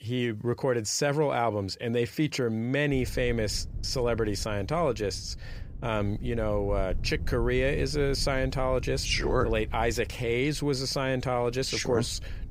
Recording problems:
wind noise on the microphone; occasional gusts; from 3 s on; 25 dB below the speech

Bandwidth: 15.5 kHz